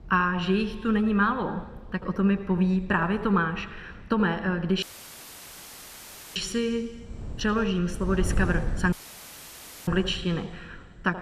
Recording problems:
room echo; very slight; dies away in 1.9 s
wind noise on the microphone; occasional gusts; 20 dB below the speech
audio cutting out; at 5 s for 1.5 s and at 9 s for 1 s

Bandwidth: 14.5 kHz